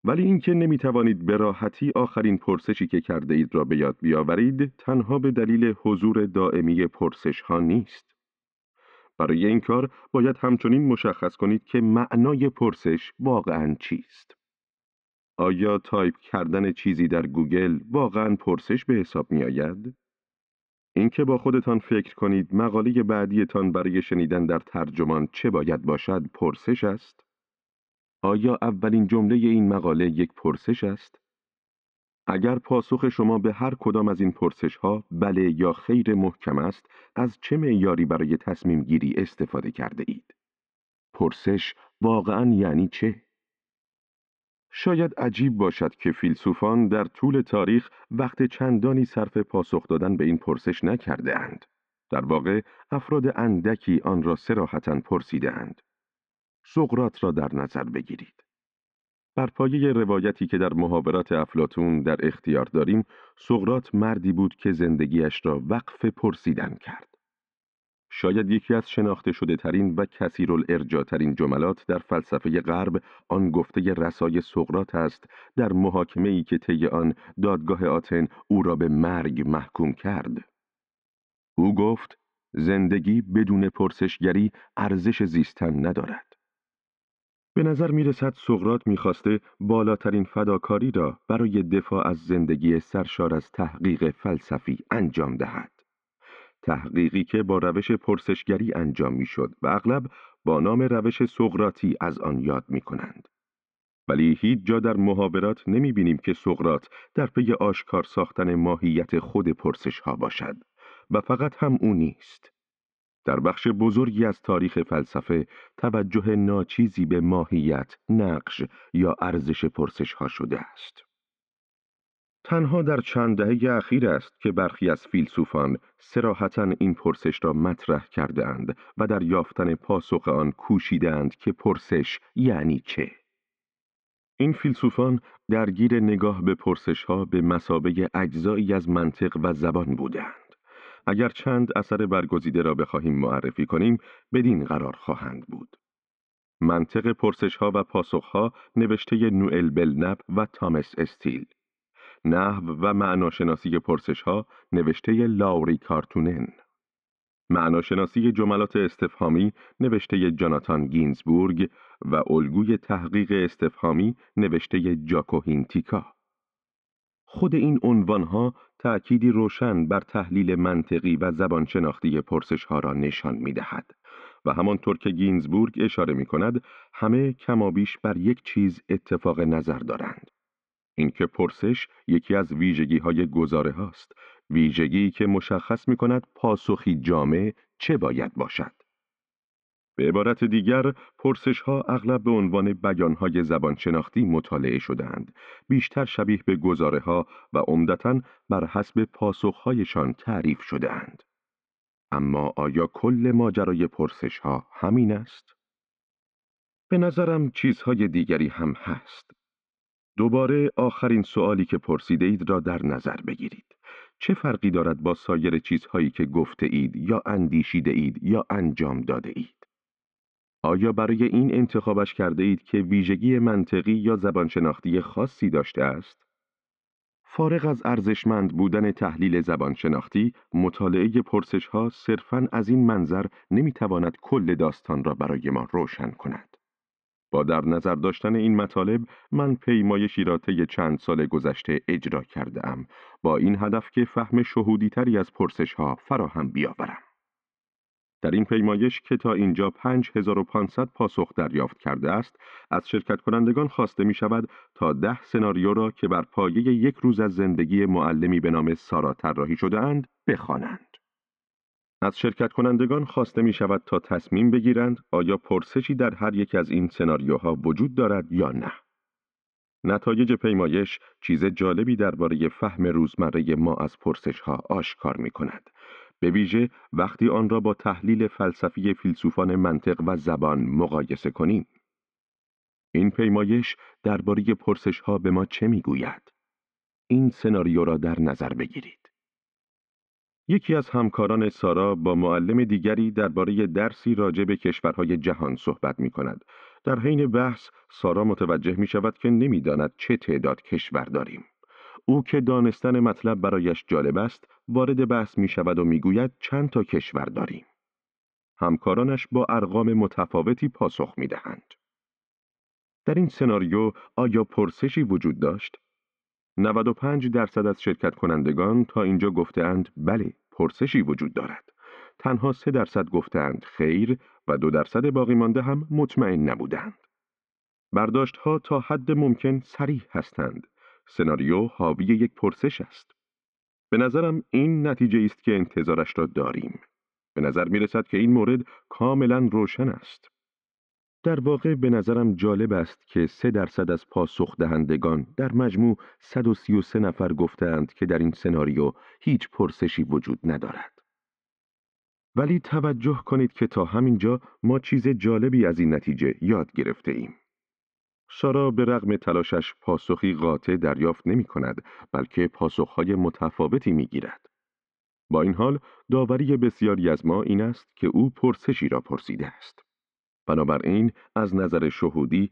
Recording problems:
muffled; very; fading above 2.5 kHz

